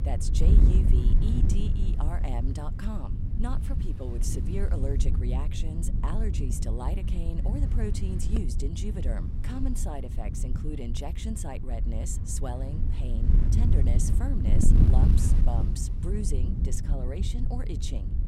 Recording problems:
wind noise on the microphone; heavy; 2 dB below the speech

